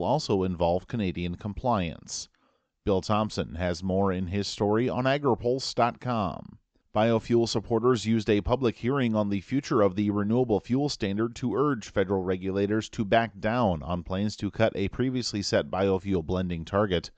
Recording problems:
high frequencies cut off; noticeable; nothing above 8 kHz
abrupt cut into speech; at the start

